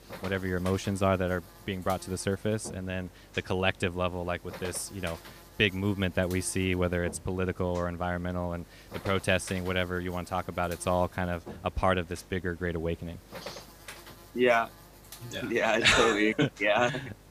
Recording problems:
electrical hum; noticeable; throughout; 50 Hz, 20 dB below the speech

